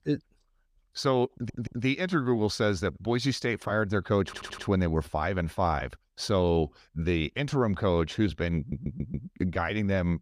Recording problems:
audio stuttering; at 1.5 s, at 4.5 s and at 8.5 s

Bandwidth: 14.5 kHz